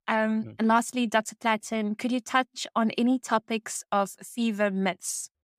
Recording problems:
none

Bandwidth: 15.5 kHz